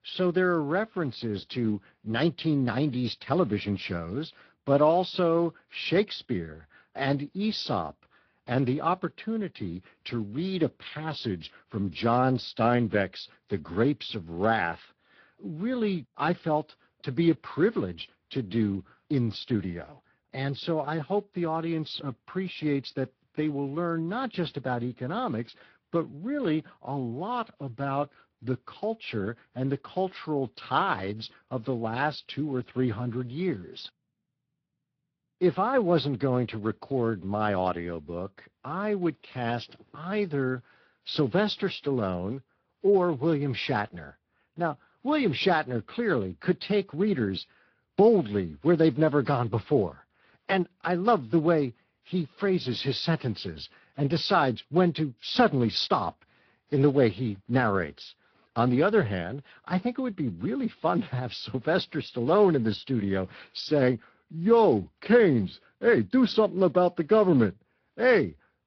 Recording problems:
high frequencies cut off; noticeable; nothing above 5.5 kHz
garbled, watery; slightly

